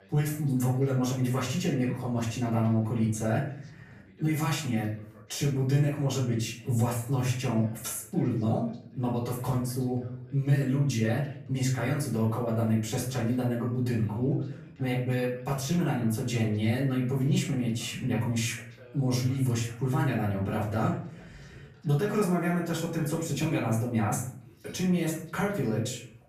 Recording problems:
off-mic speech; far
room echo; slight; dies away in 0.5 s
voice in the background; faint; throughout; 25 dB below the speech

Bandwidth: 14.5 kHz